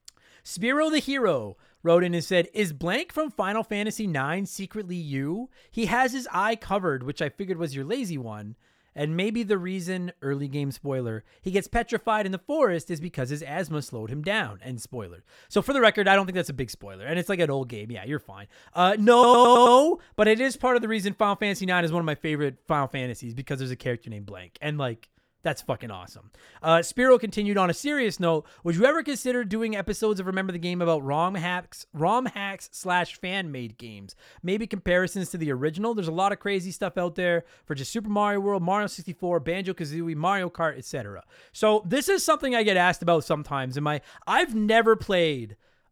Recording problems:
audio stuttering; at 19 s

